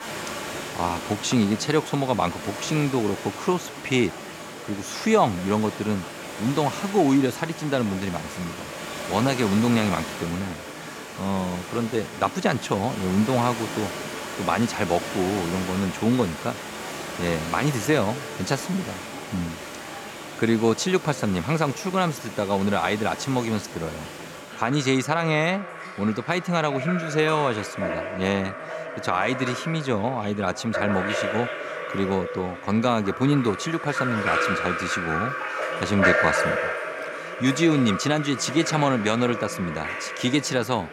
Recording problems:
rain or running water; loud; throughout; 6 dB below the speech
background chatter; faint; throughout; 3 voices, 20 dB below the speech

